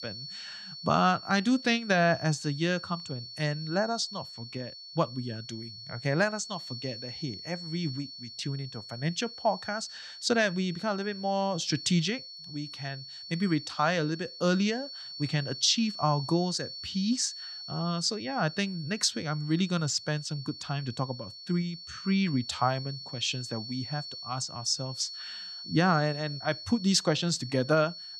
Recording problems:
high-pitched whine; noticeable; throughout; 4.5 kHz, 10 dB below the speech

